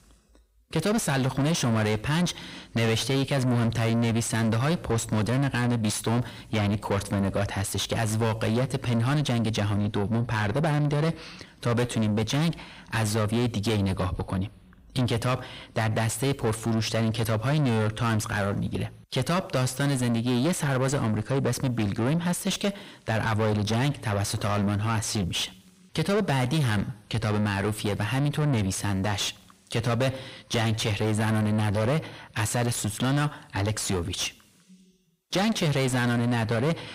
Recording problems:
distortion; heavy; 6 dB below the speech

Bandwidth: 15.5 kHz